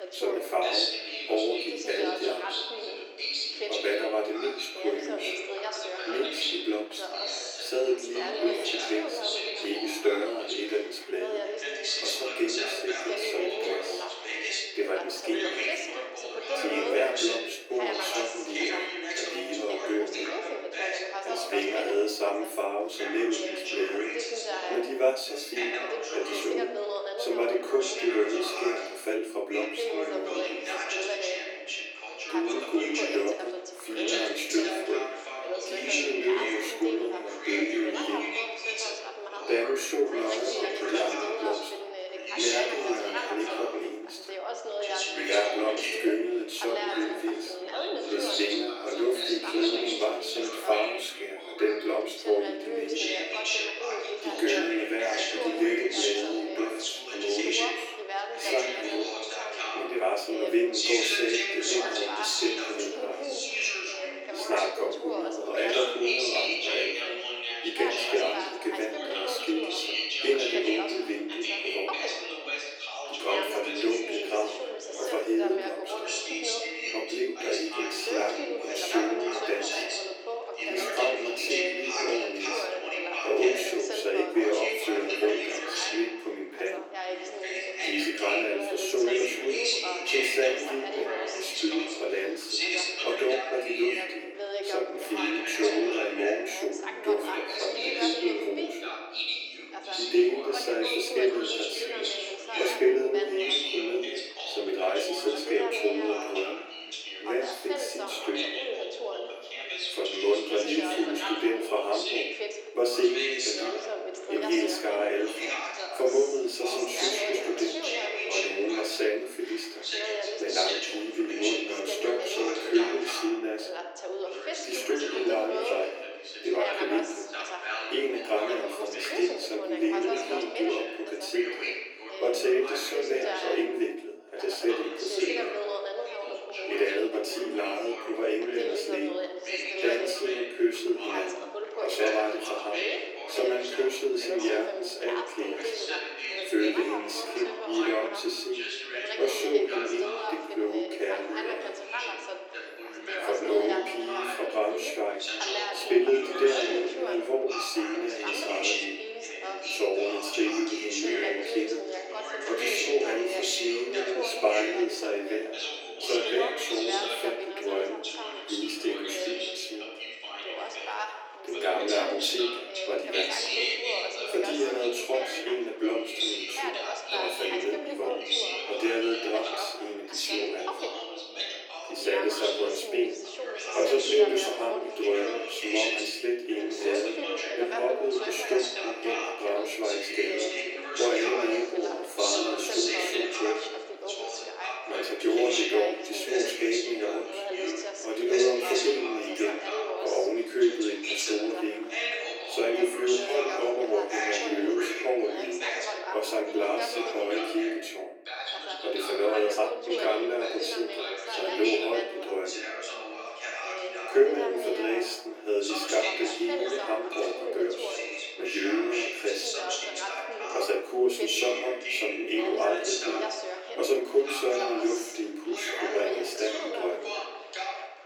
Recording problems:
off-mic speech; far
thin; very; fading below 300 Hz
room echo; slight; dies away in 0.5 s
background chatter; loud; throughout; 2 voices, 2 dB below the speech

